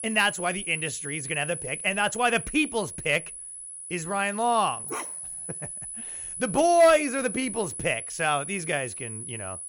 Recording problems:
high-pitched whine; loud; throughout; 10 kHz, 8 dB below the speech
dog barking; faint; at 5 s; peak 10 dB below the speech

